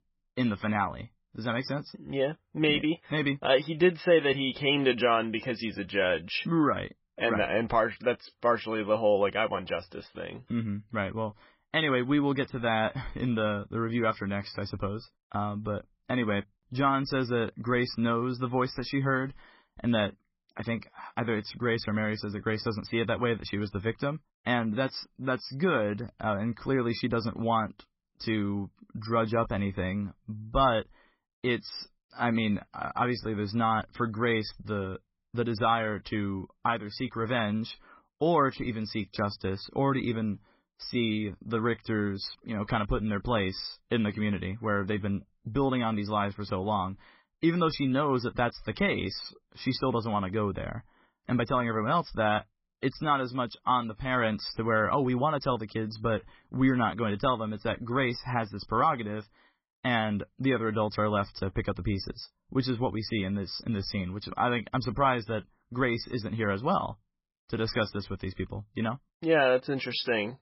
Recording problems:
garbled, watery; badly; nothing above 5.5 kHz

